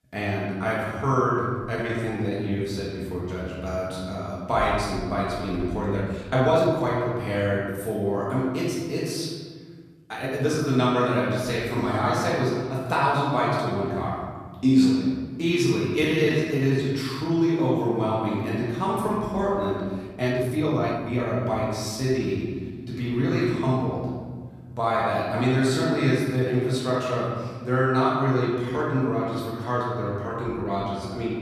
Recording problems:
off-mic speech; far
room echo; noticeable; dies away in 1.5 s
uneven, jittery; strongly; from 0.5 to 31 s

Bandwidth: 14.5 kHz